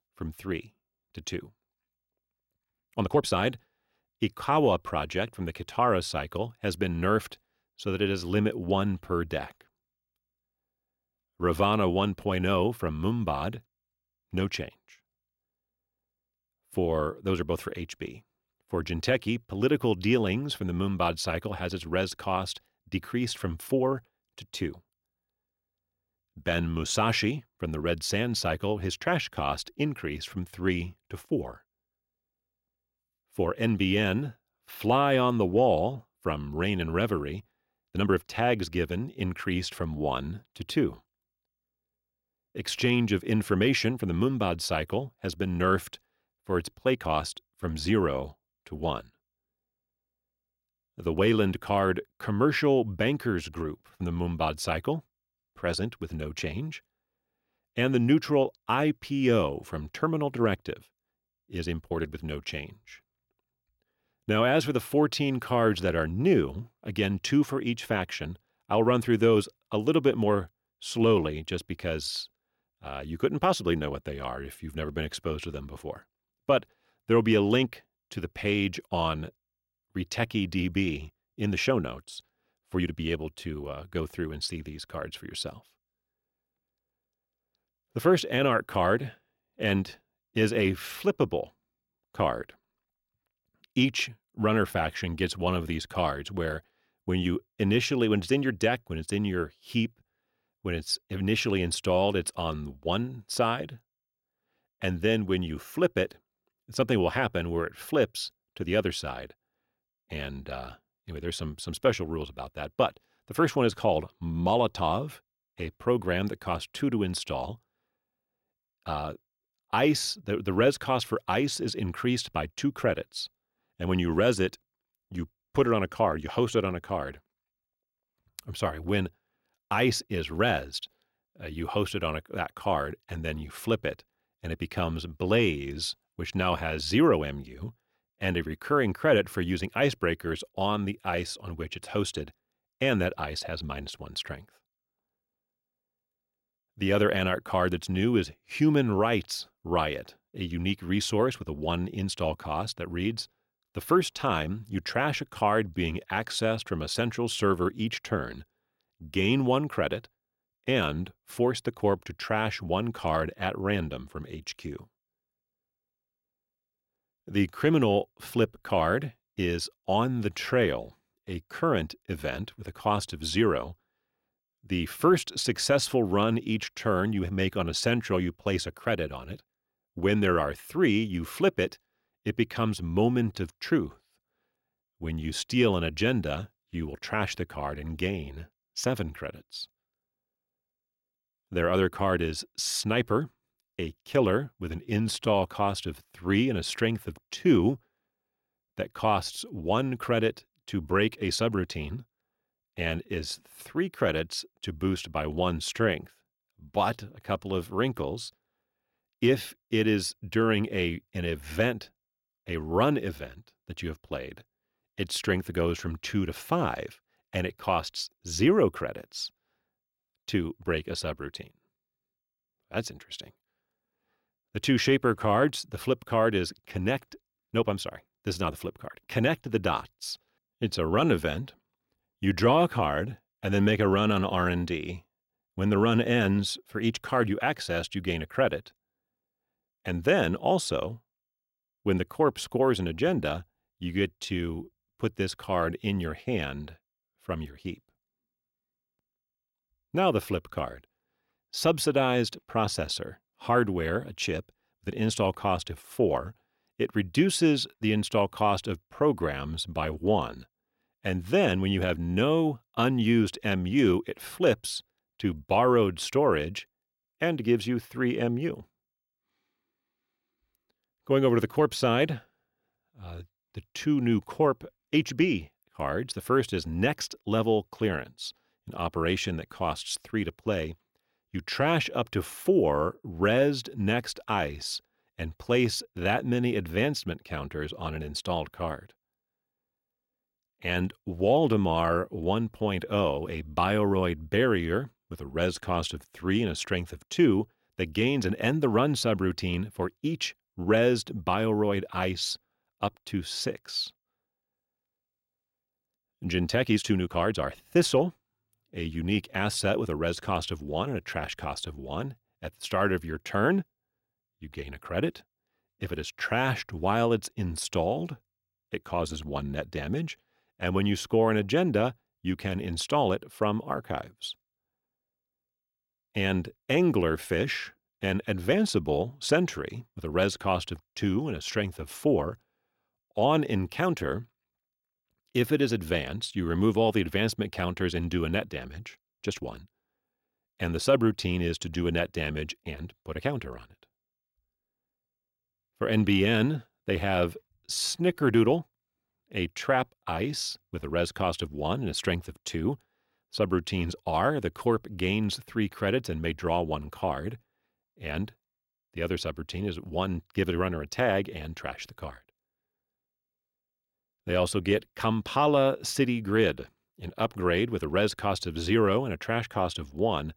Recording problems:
uneven, jittery; strongly; from 3 s to 5:51

